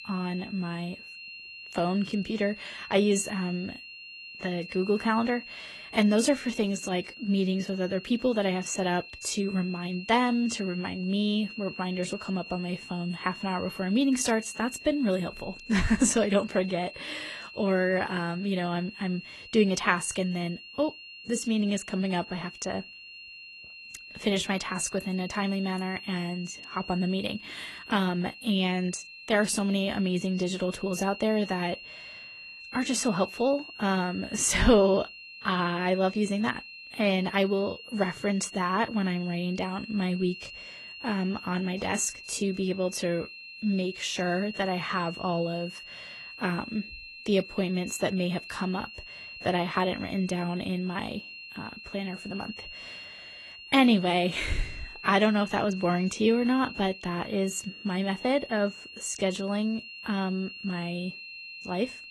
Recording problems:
garbled, watery; slightly; nothing above 11.5 kHz
high-pitched whine; noticeable; throughout; 3 kHz, 15 dB below the speech

